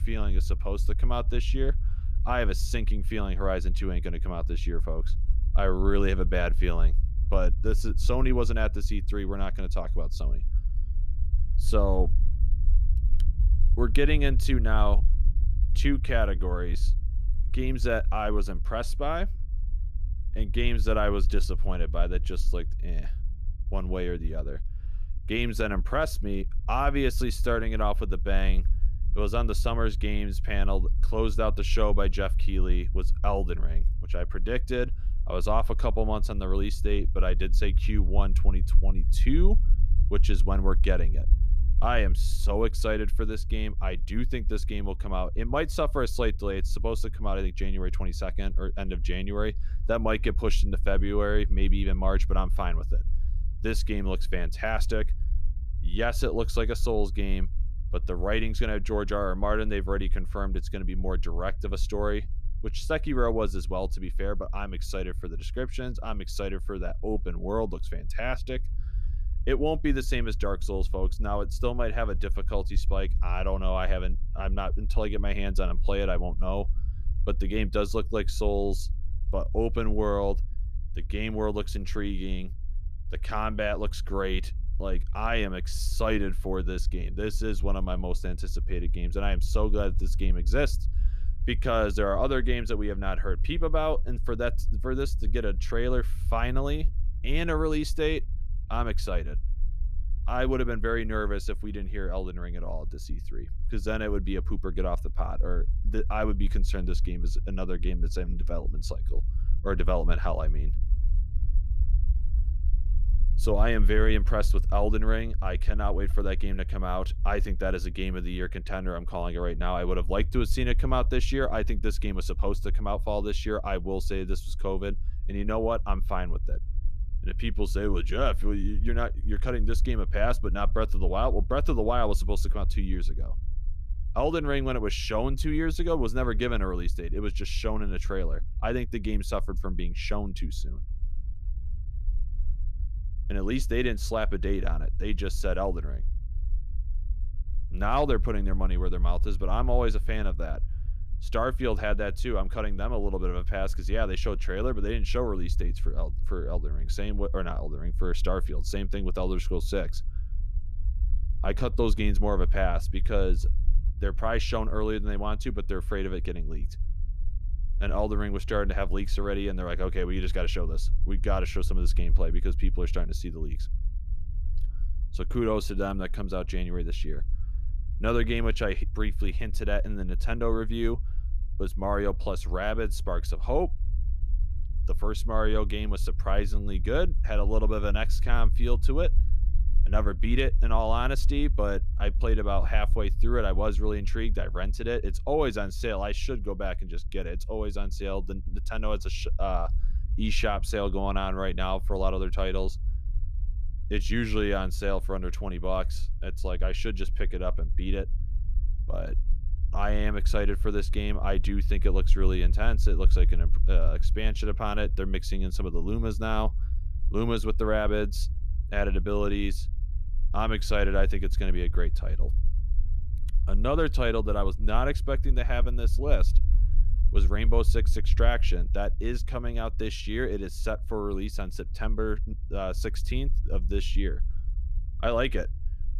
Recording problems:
low rumble; faint; throughout; 20 dB below the speech

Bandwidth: 14.5 kHz